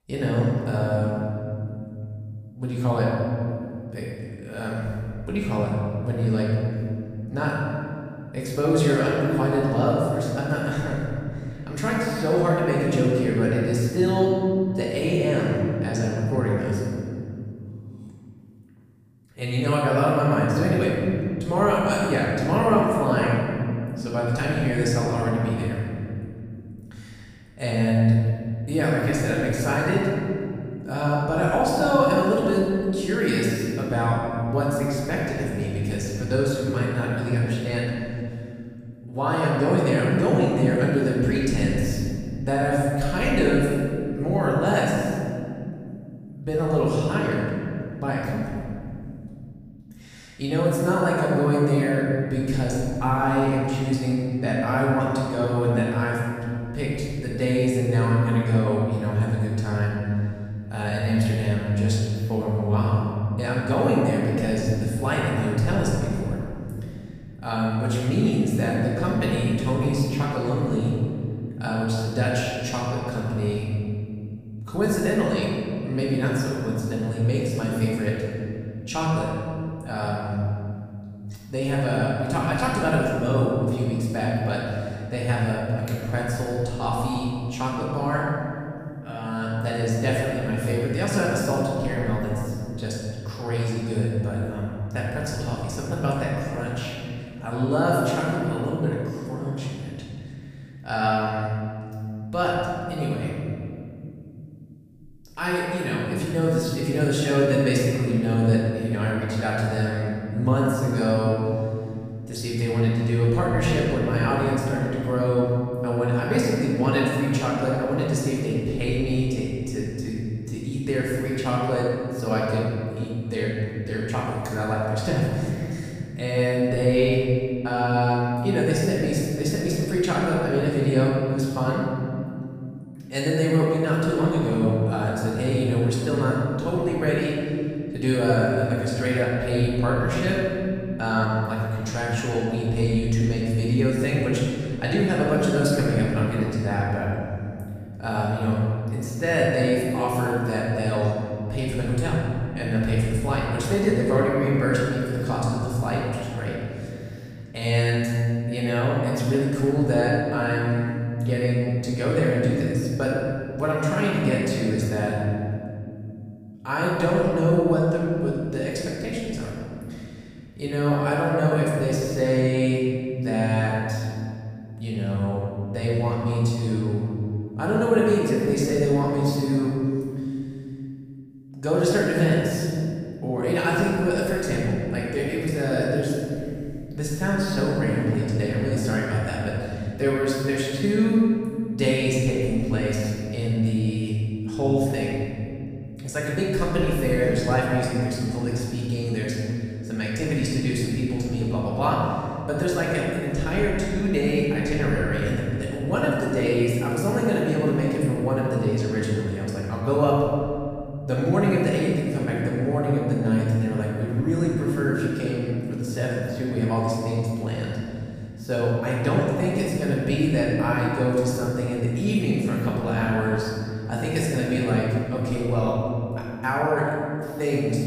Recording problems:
room echo; strong; dies away in 2.9 s
off-mic speech; far

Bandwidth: 15 kHz